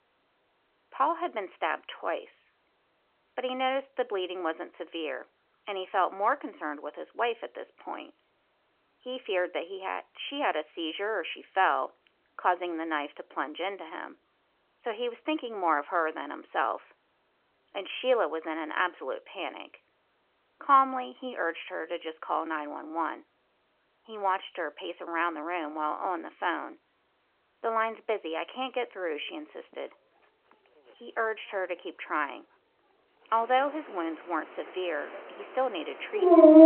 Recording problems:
phone-call audio; nothing above 3 kHz
animal sounds; very loud; from 29 s on; 6 dB above the speech

